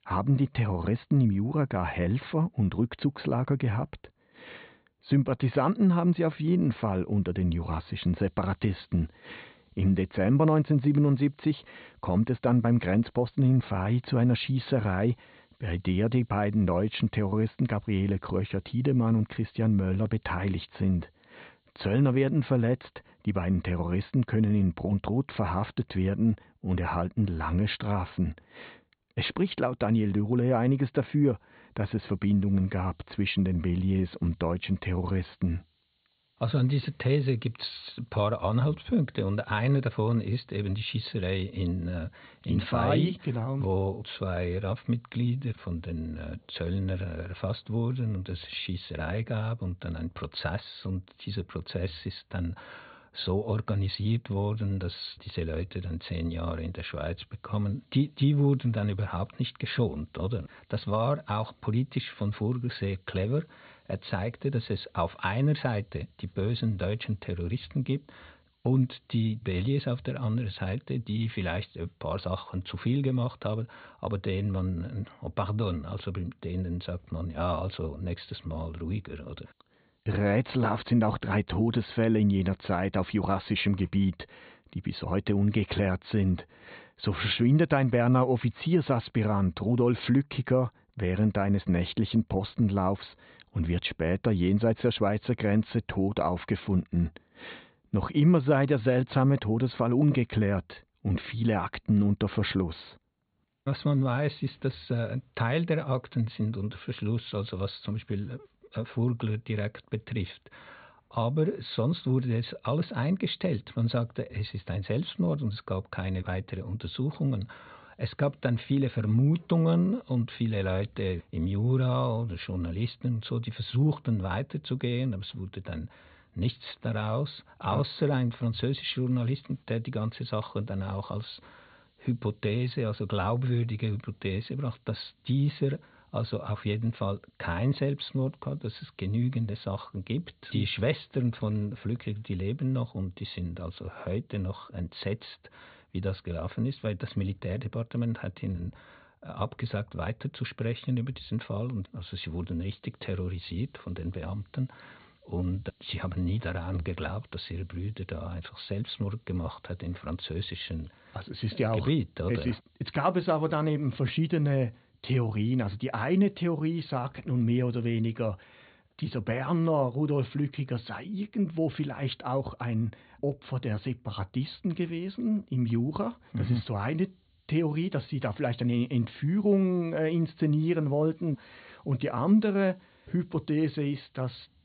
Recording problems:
high frequencies cut off; severe; nothing above 4.5 kHz
hiss; very faint; until 1:20 and from 1:58 on; 45 dB below the speech

